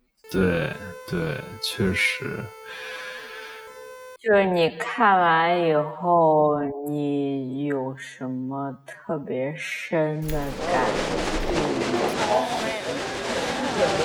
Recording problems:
wrong speed, natural pitch; too slow; 0.5 times normal speed
crowd noise; loud; from 11 s on; 1 dB below the speech
siren; faint; until 4 s; peak 15 dB below the speech
jangling keys; faint; from 10 to 12 s; peak 15 dB below the speech

